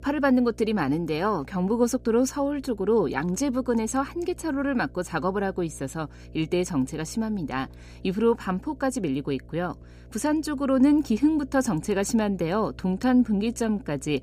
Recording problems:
electrical hum; faint; throughout; 60 Hz, 30 dB below the speech

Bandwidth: 15 kHz